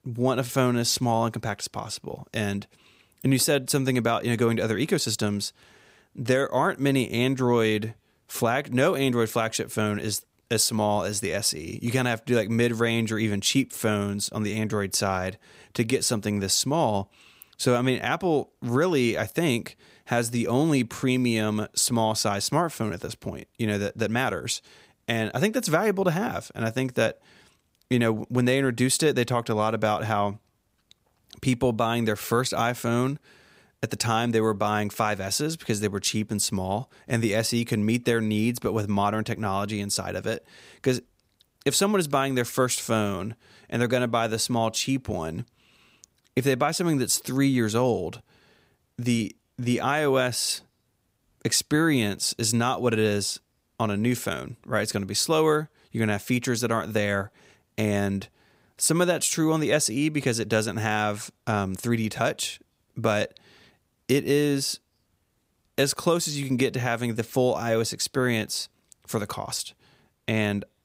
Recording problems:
none

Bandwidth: 15.5 kHz